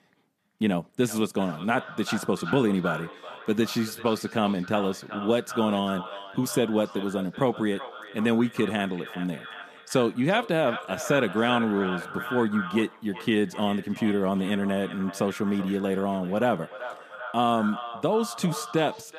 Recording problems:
echo of what is said; strong; throughout; 380 ms later, 10 dB below the speech

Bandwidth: 14.5 kHz